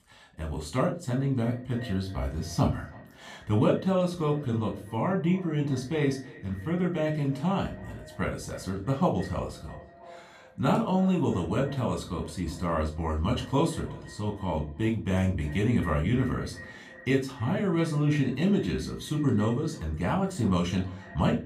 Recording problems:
echo of what is said; faint; throughout; 320 ms later, 20 dB below the speech
room echo; very slight; dies away in 0.3 s
off-mic speech; somewhat distant

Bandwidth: 15 kHz